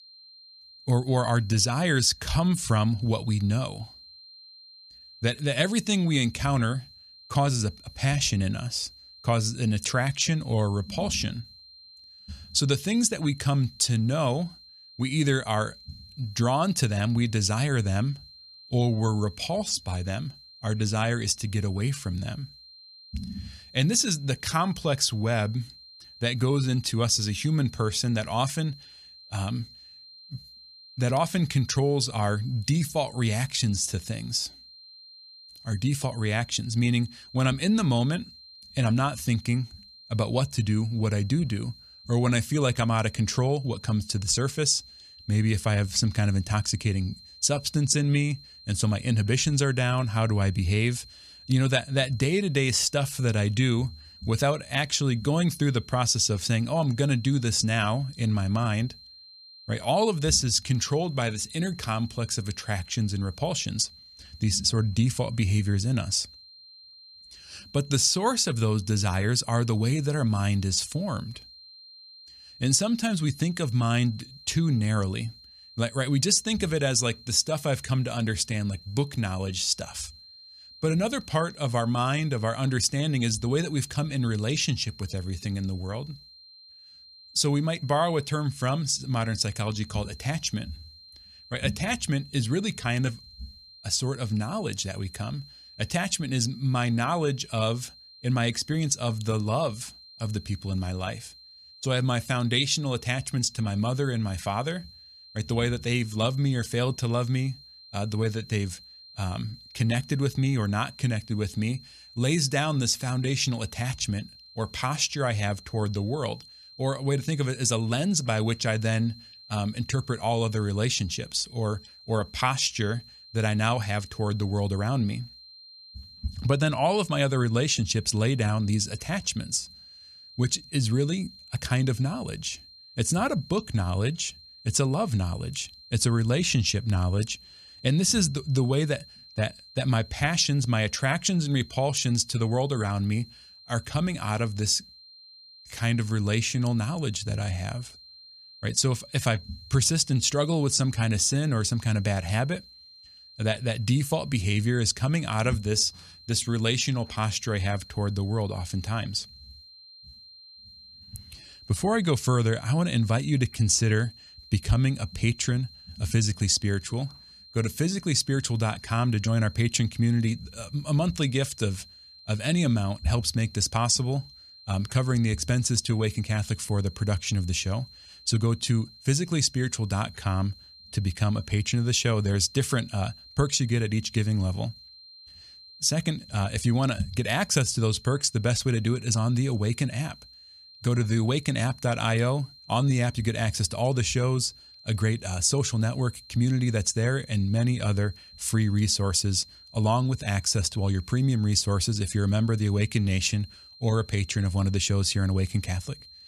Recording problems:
high-pitched whine; faint; throughout; 4 kHz, 20 dB below the speech

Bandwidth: 14.5 kHz